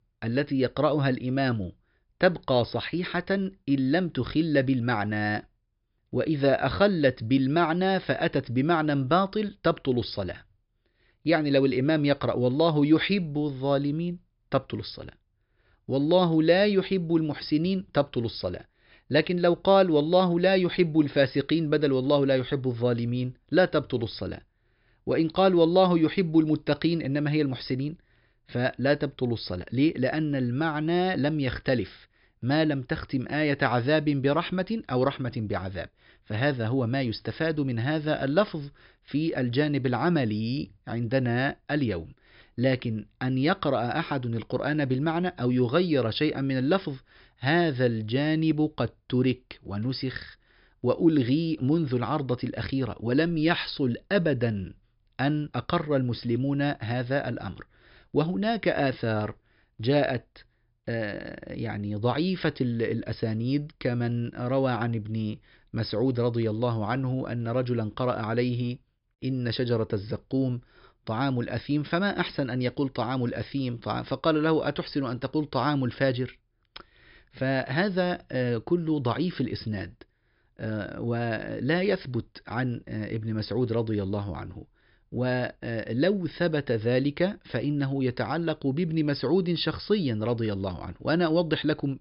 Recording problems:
high frequencies cut off; noticeable; nothing above 5.5 kHz

